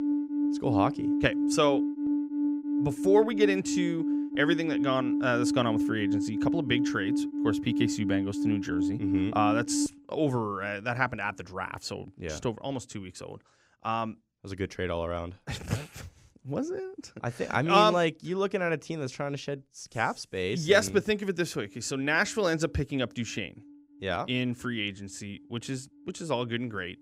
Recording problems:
alarms or sirens; very loud; throughout; as loud as the speech

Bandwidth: 15.5 kHz